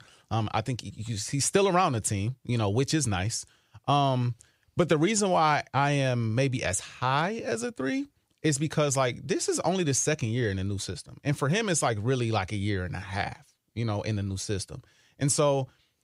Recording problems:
none

